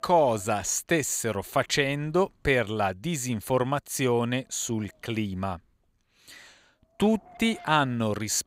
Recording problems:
wind noise on the microphone; occasional gusts; 25 dB below the speech

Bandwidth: 15.5 kHz